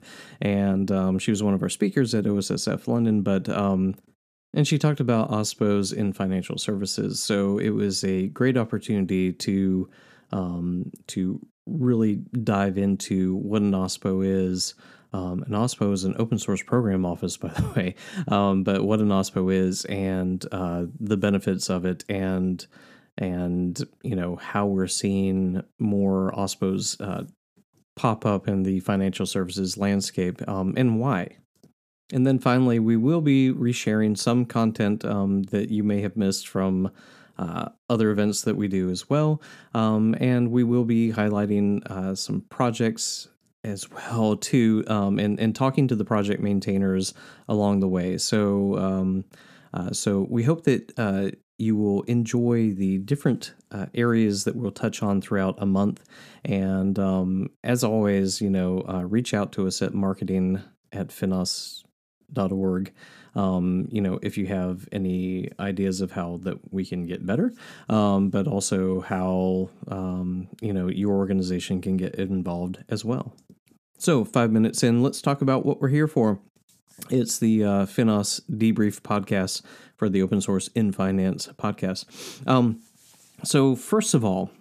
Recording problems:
none

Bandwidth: 14.5 kHz